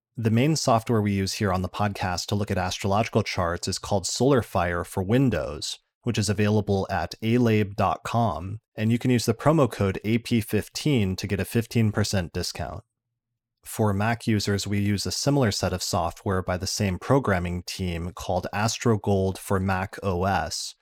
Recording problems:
none

